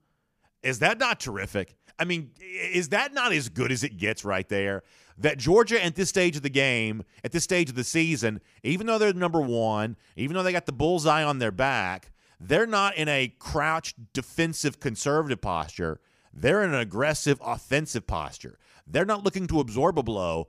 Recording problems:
none

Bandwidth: 15 kHz